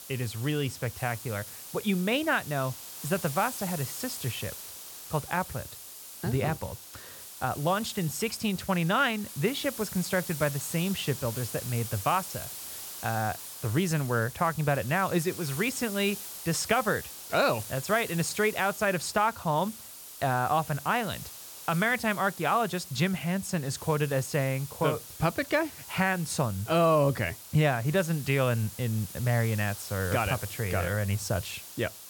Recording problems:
hiss; noticeable; throughout; 10 dB below the speech

